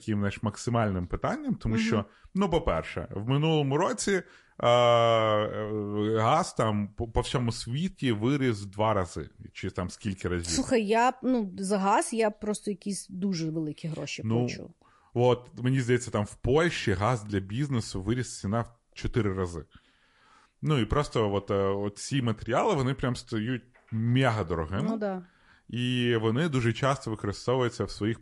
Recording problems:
garbled, watery; slightly; nothing above 11 kHz

